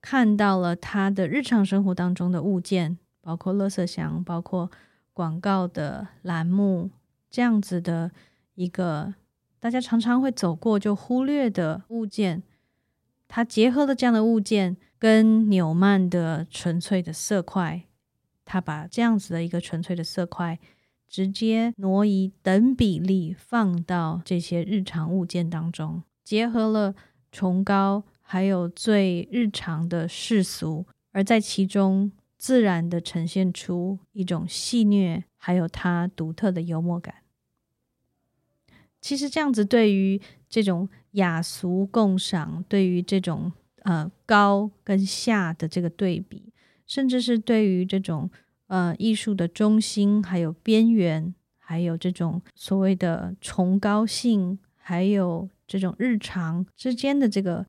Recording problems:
none

